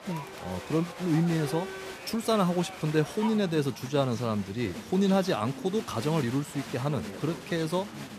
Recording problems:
crowd noise; noticeable; throughout; 10 dB below the speech

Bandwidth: 14.5 kHz